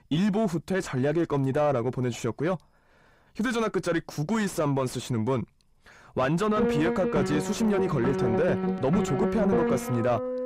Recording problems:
distortion; slight; 9 dB below the speech
background music; loud; from 6.5 s on; 1 dB below the speech

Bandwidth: 15.5 kHz